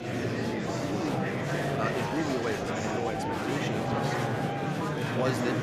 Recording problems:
murmuring crowd; very loud; throughout; 5 dB above the speech

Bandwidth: 14.5 kHz